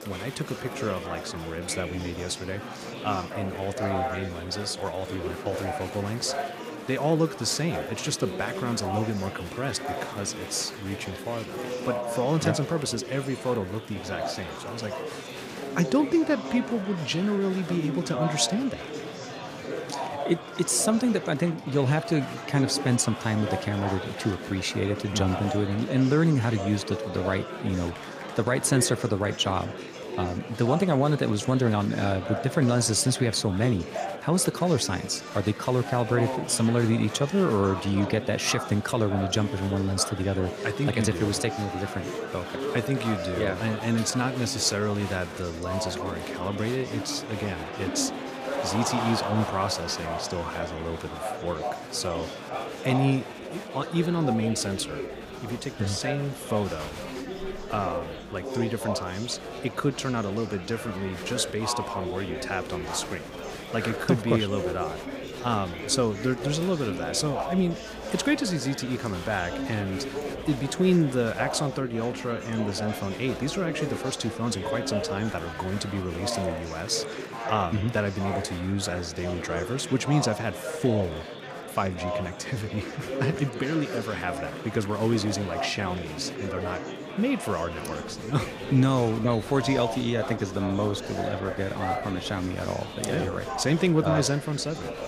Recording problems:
murmuring crowd; loud; throughout; 7 dB below the speech

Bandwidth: 15 kHz